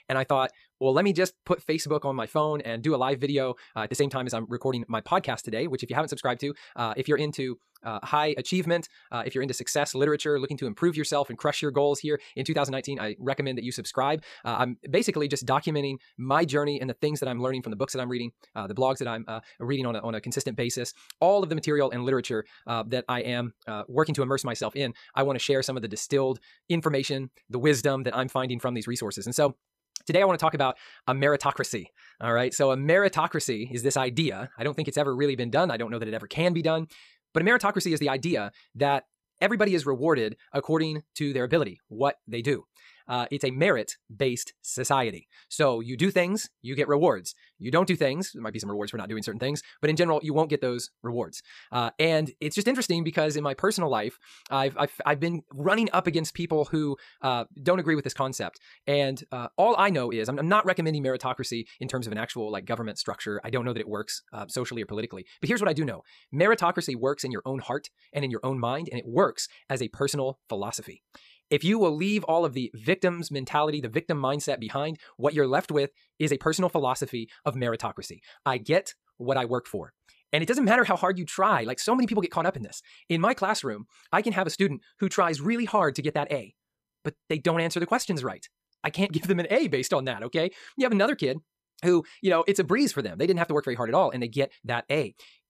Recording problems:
wrong speed, natural pitch; too fast; 1.6 times normal speed

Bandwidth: 14.5 kHz